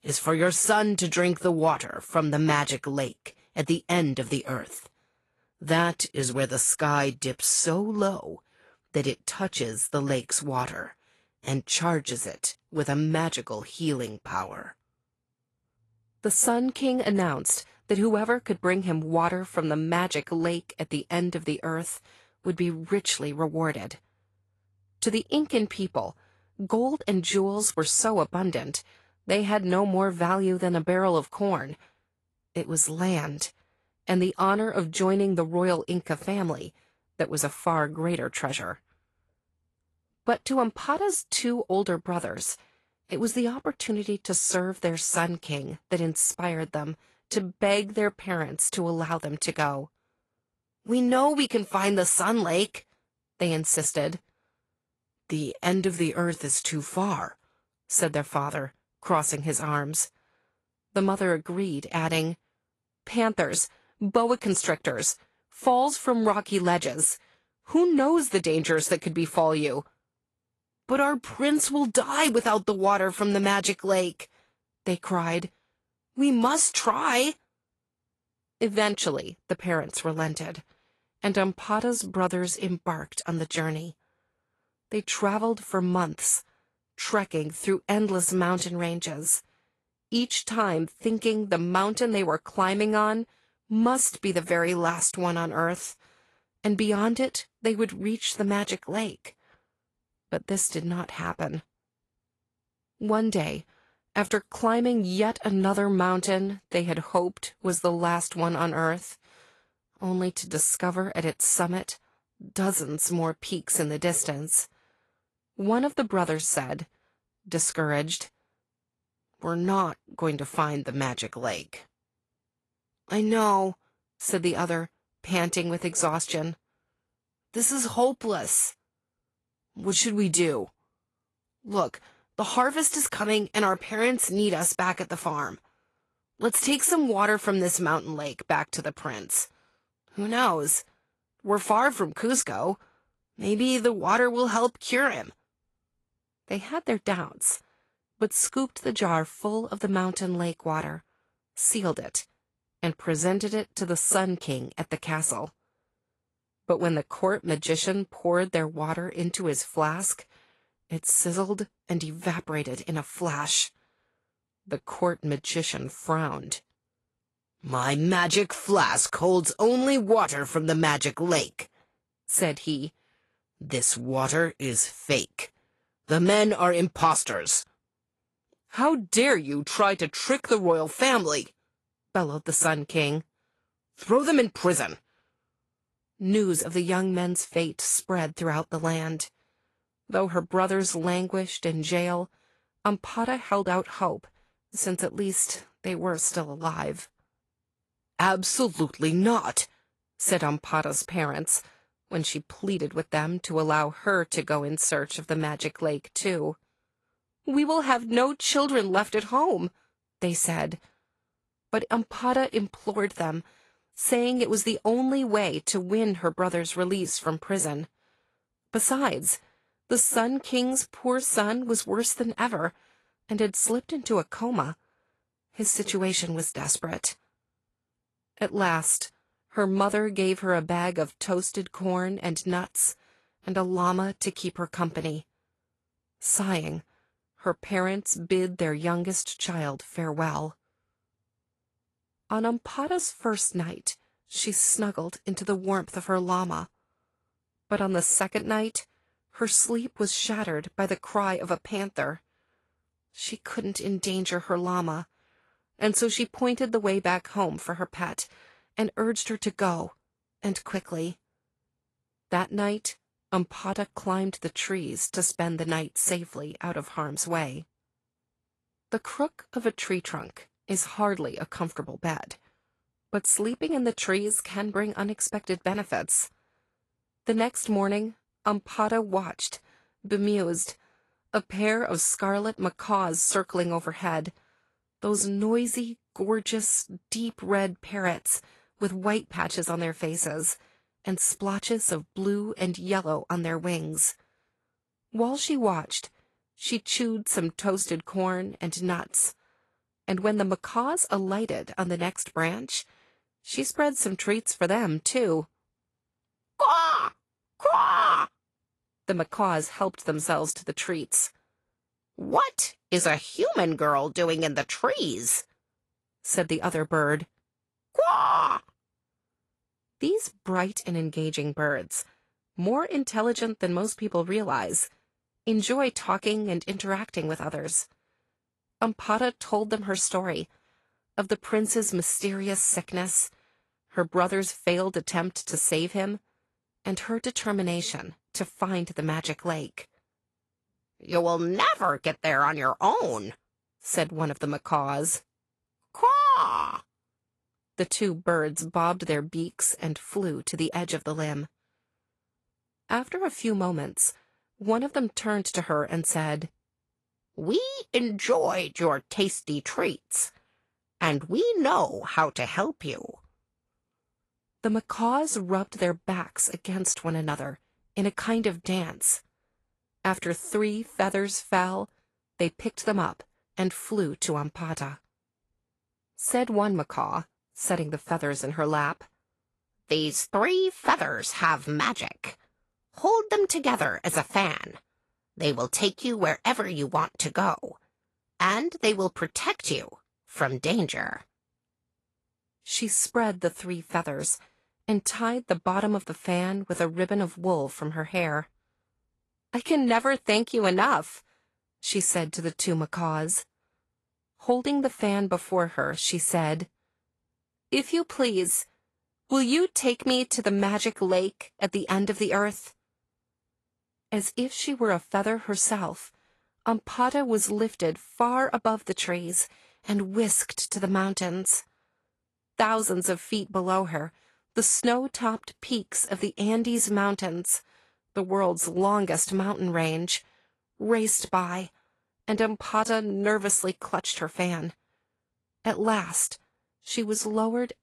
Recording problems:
garbled, watery; slightly; nothing above 11.5 kHz

